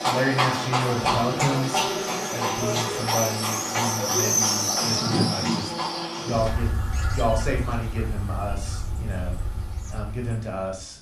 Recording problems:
room echo; slight; dies away in 0.3 s
off-mic speech; somewhat distant
animal sounds; very loud; throughout; 4 dB above the speech
high-pitched whine; faint; throughout; 10 kHz, 30 dB below the speech

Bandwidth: 13.5 kHz